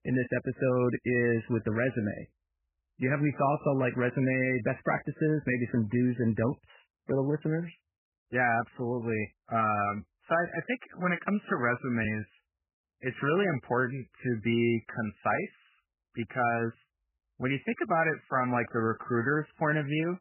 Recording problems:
garbled, watery; badly; nothing above 3 kHz

